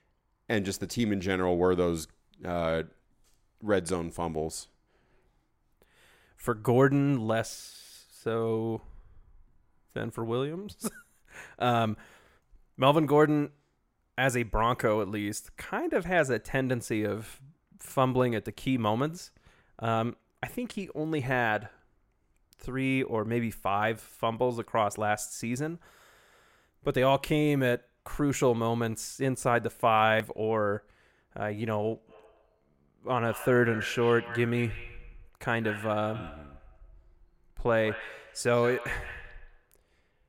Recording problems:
echo of what is said; noticeable; from 32 s on; 170 ms later, 10 dB below the speech

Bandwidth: 16 kHz